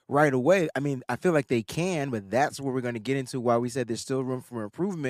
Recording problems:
abrupt cut into speech; at the end

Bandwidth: 15 kHz